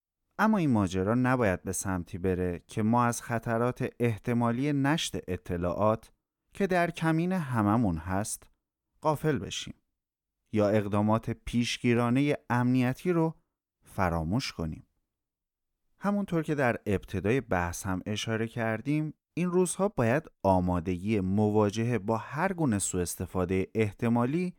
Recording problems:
none

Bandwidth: 18 kHz